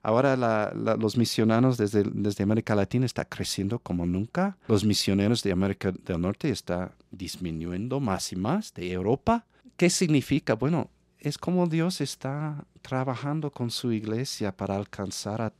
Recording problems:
none

